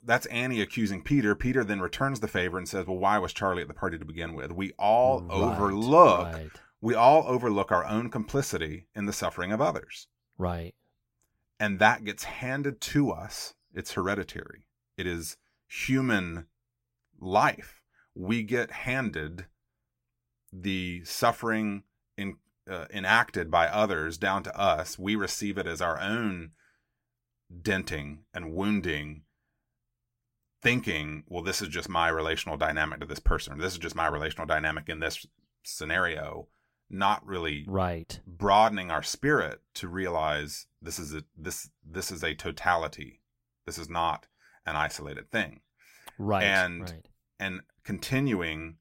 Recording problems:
none

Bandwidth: 16 kHz